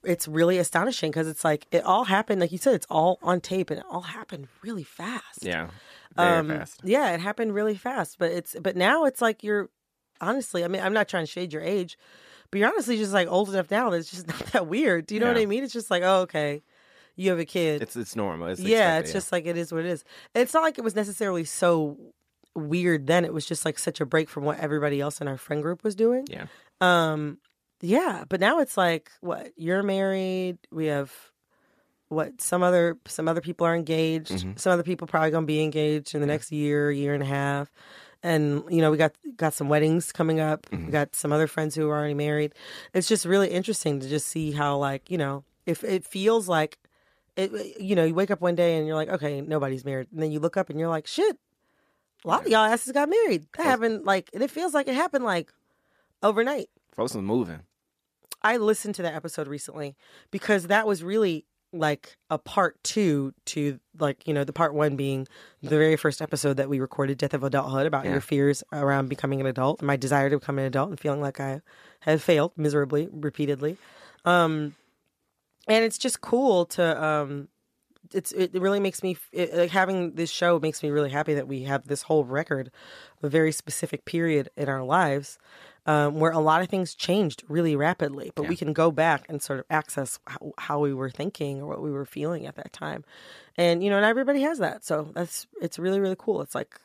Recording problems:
none

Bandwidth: 14.5 kHz